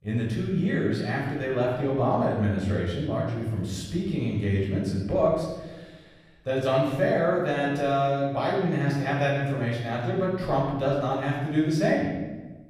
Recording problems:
off-mic speech; far
room echo; noticeable; dies away in 1.1 s

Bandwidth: 15 kHz